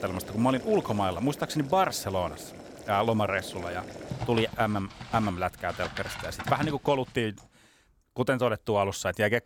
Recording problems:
household noises; noticeable; until 7 s; 10 dB below the speech

